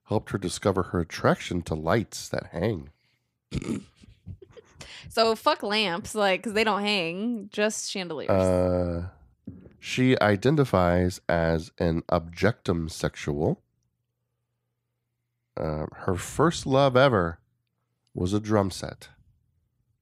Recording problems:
none

